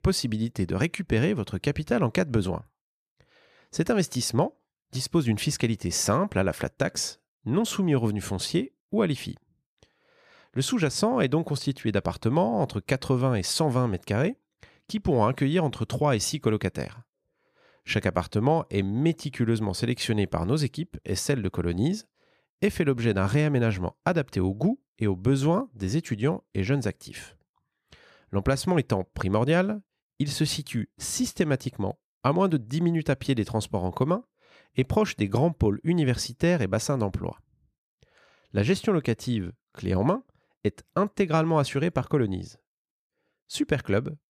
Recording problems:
none

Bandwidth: 14.5 kHz